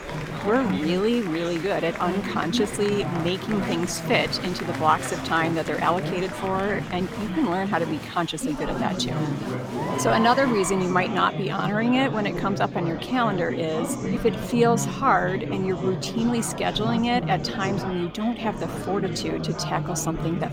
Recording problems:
chatter from many people; loud; throughout; 5 dB below the speech

